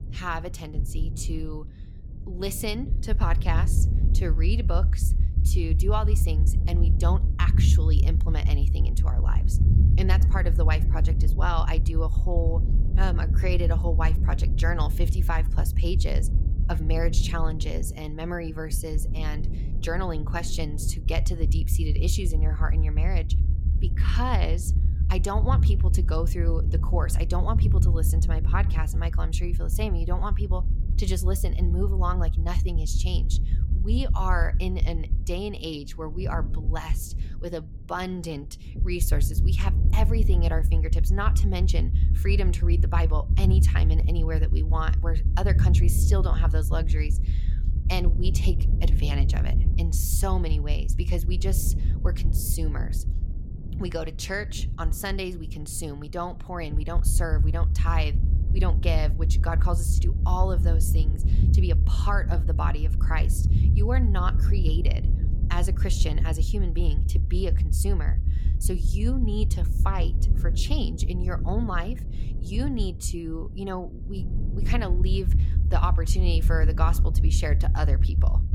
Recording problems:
low rumble; loud; throughout; 8 dB below the speech

